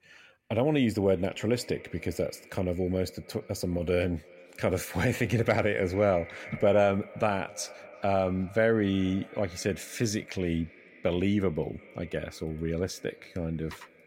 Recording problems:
echo of what is said; faint; throughout; 350 ms later, 20 dB below the speech

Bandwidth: 16 kHz